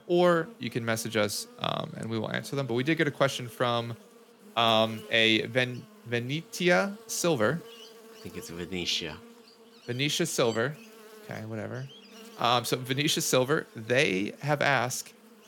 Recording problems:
electrical hum; faint; throughout; 60 Hz, 25 dB below the speech

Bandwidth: 17.5 kHz